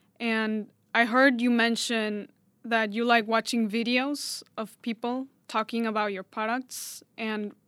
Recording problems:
none

